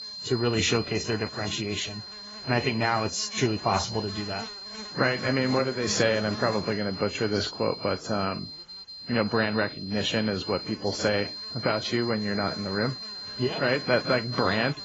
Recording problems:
garbled, watery; badly; nothing above 7.5 kHz
high-pitched whine; loud; throughout; 4 kHz, 9 dB below the speech
electrical hum; noticeable; throughout; 60 Hz, 20 dB below the speech

